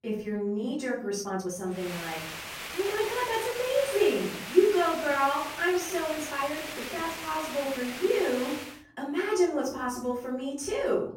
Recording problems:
off-mic speech; far
room echo; noticeable; dies away in 0.6 s
hiss; loud; from 2 to 8.5 s; 8 dB below the speech
uneven, jittery; strongly; from 0.5 to 9.5 s

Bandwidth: 16 kHz